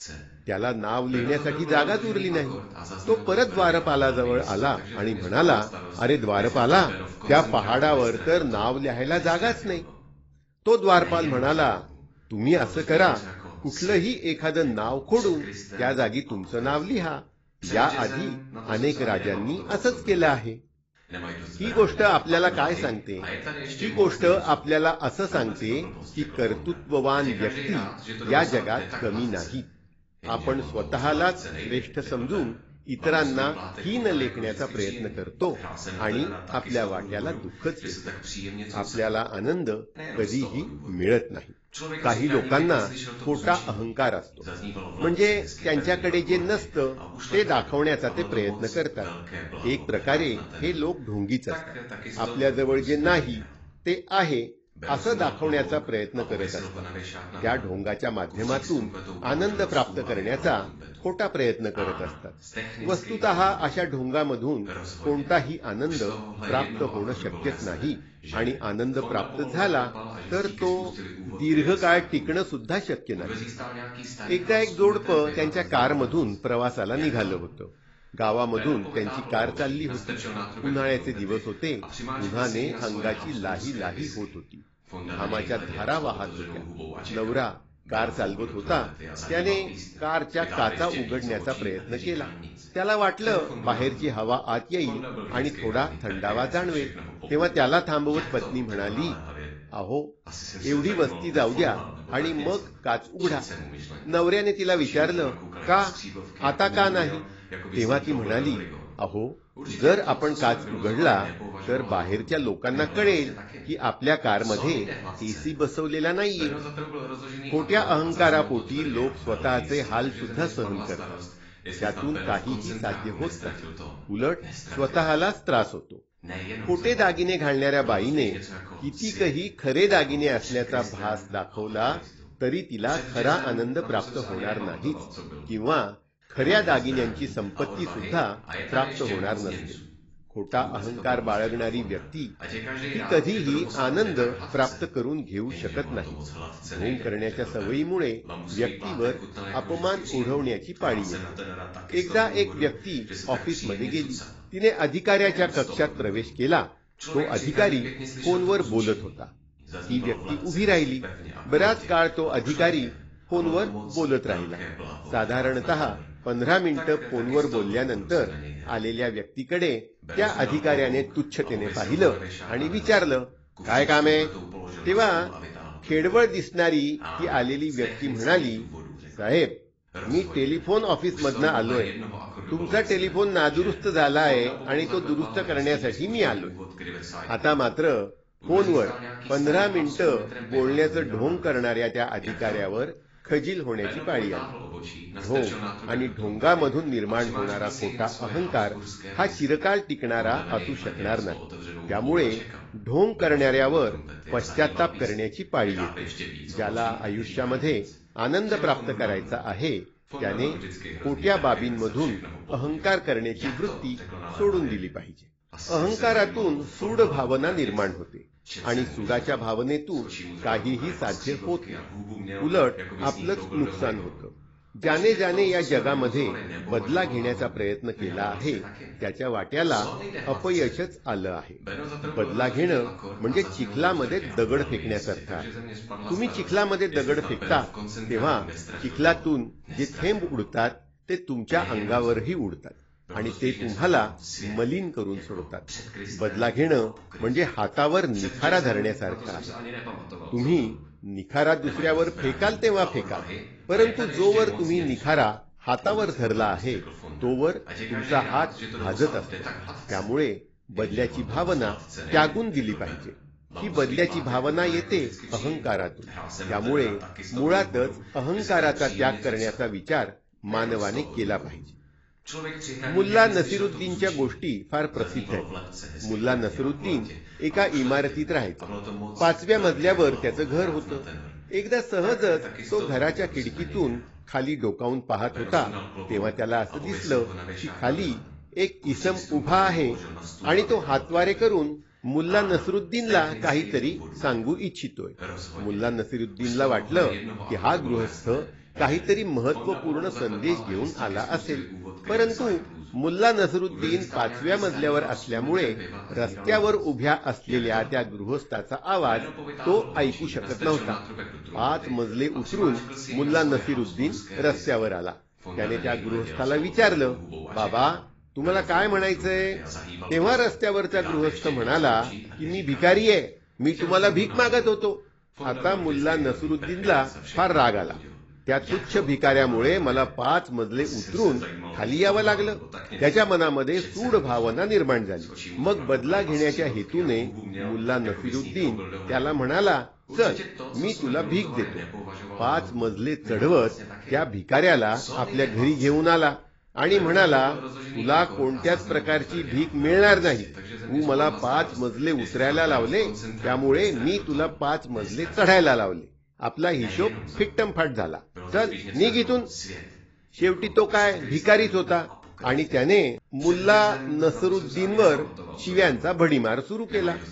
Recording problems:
garbled, watery; badly; nothing above 7.5 kHz
voice in the background; noticeable; throughout; 10 dB below the speech

